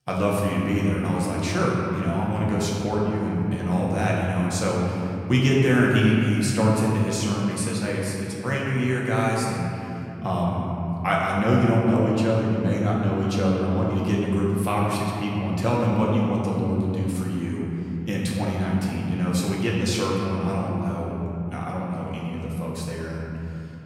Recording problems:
off-mic speech; far
room echo; noticeable; dies away in 3 s

